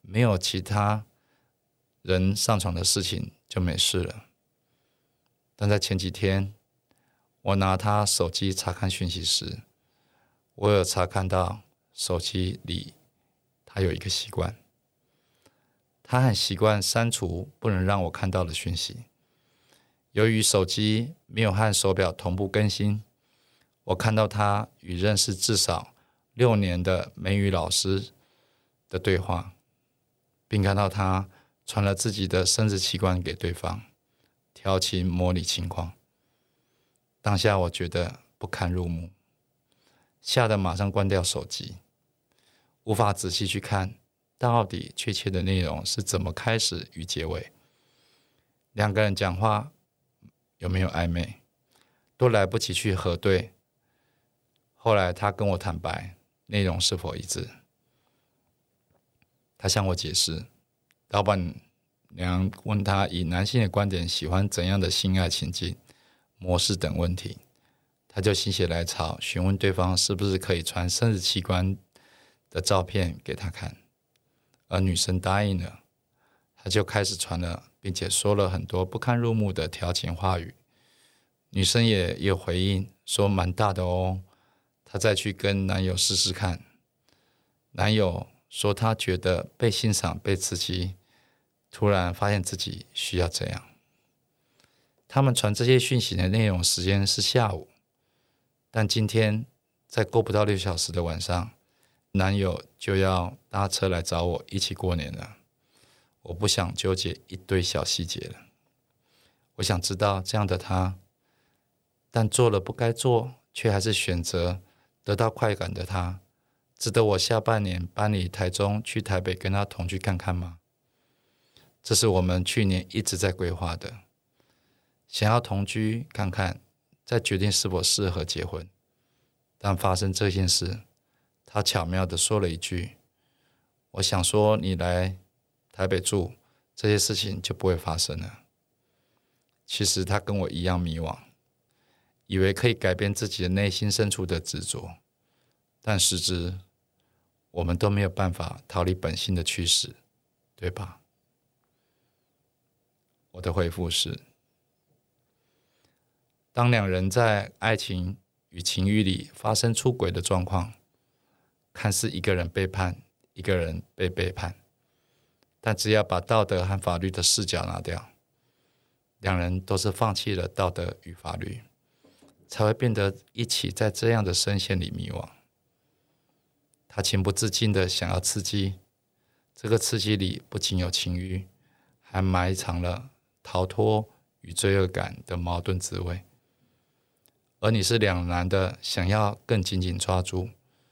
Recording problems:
none

